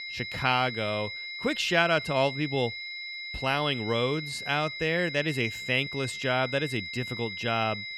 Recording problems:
high-pitched whine; loud; throughout; 2 kHz, 7 dB below the speech

